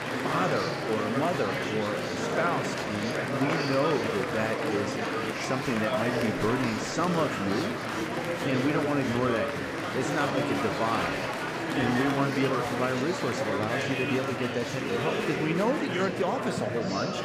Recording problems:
murmuring crowd; very loud; throughout; 1 dB above the speech

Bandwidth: 15.5 kHz